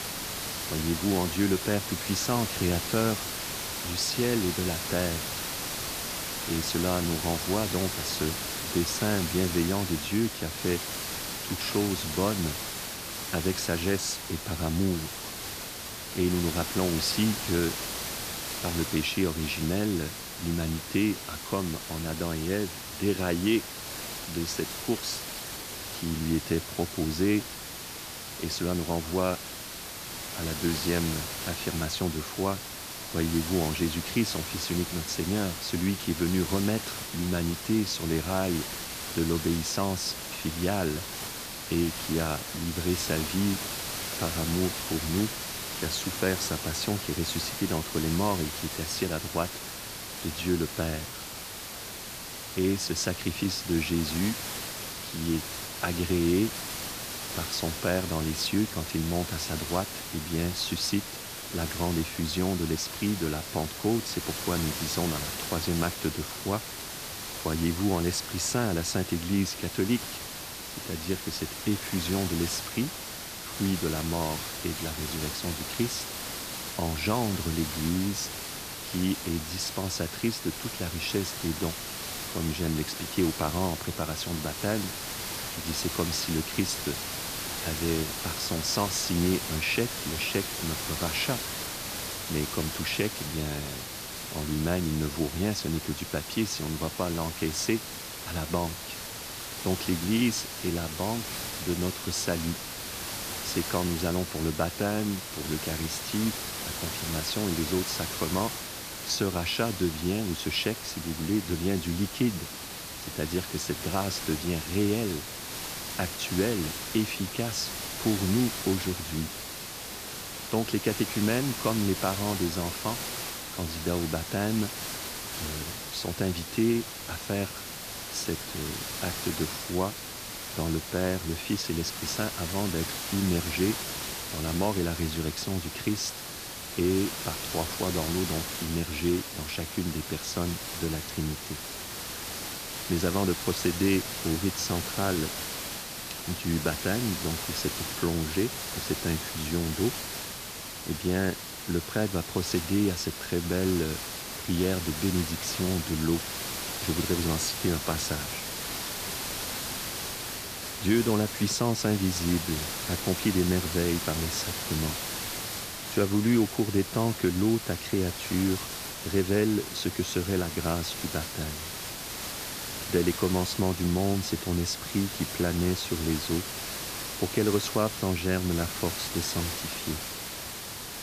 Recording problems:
hiss; loud; throughout; 4 dB below the speech

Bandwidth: 14.5 kHz